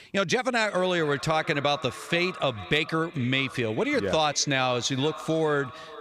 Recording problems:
echo of what is said; noticeable; throughout; 440 ms later, 15 dB below the speech

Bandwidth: 15 kHz